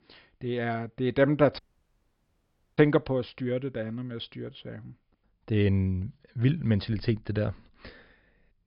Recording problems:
high frequencies cut off; noticeable; nothing above 5.5 kHz
audio cutting out; at 1.5 s for 1 s

